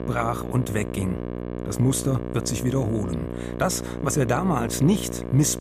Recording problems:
electrical hum; loud; throughout; 60 Hz, 7 dB below the speech

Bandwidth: 15 kHz